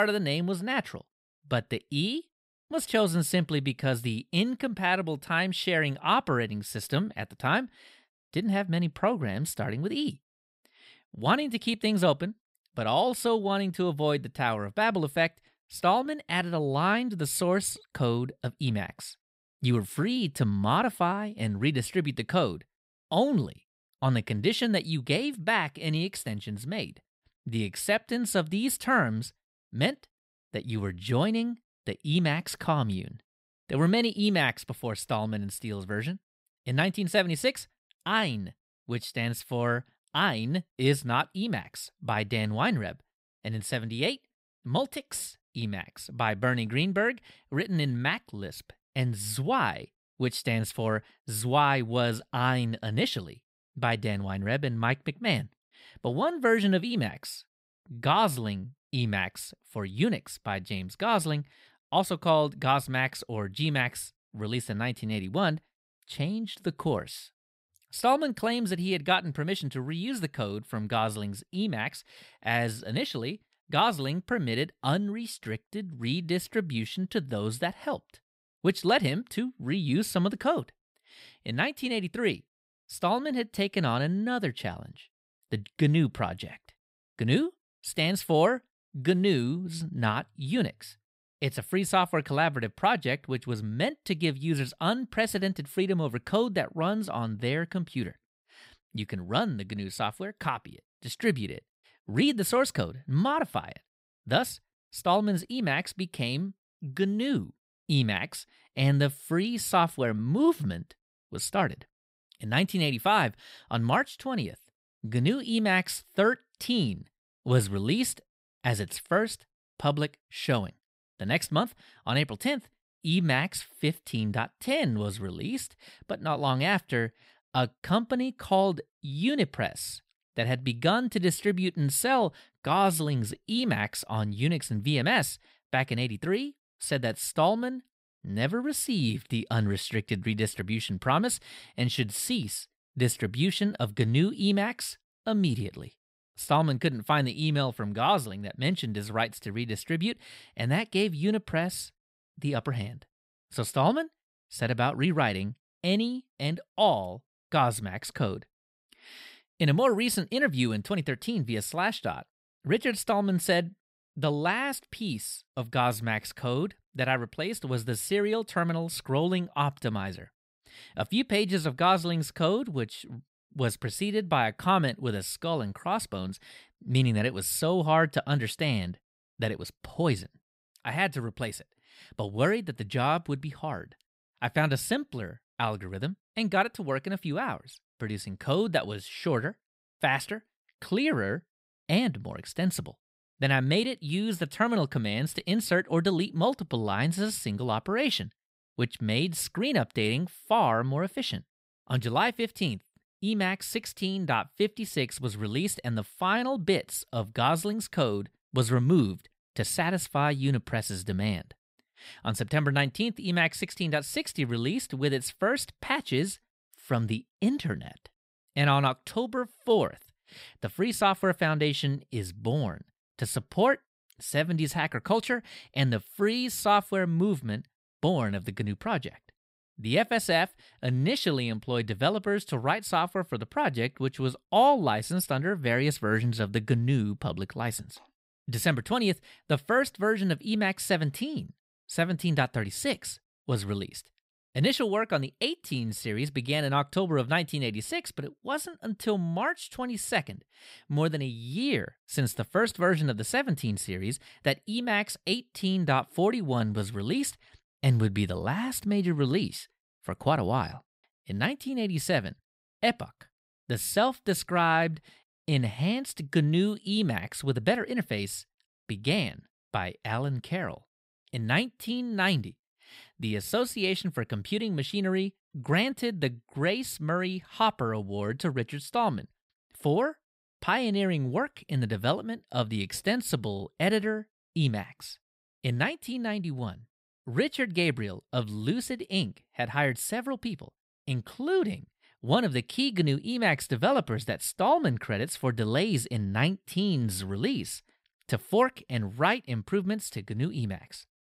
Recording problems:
abrupt cut into speech; at the start

